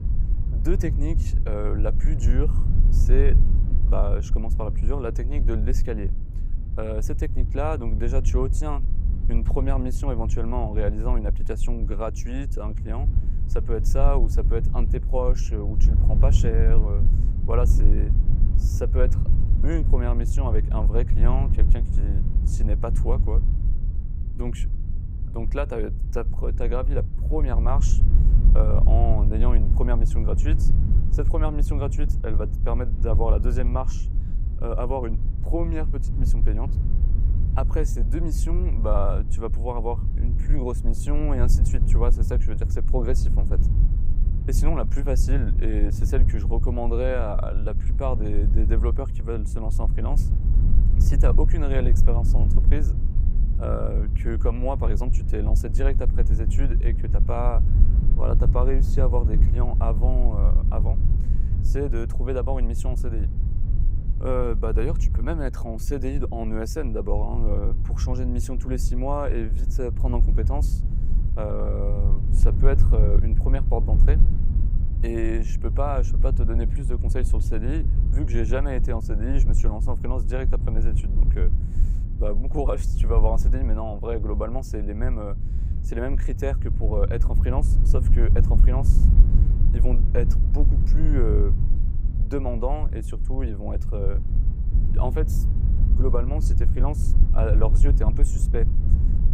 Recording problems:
low rumble; loud; throughout; 9 dB below the speech

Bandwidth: 15.5 kHz